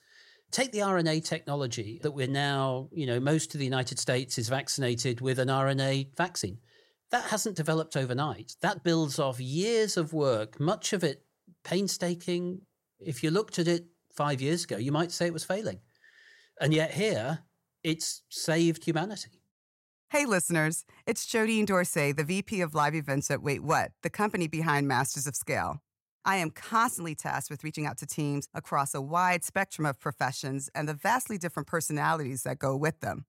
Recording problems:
uneven, jittery; slightly; from 6.5 to 28 s

